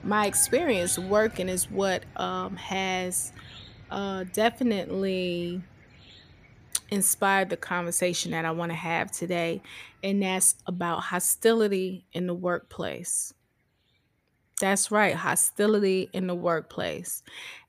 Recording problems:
animal sounds; faint; throughout; 20 dB below the speech

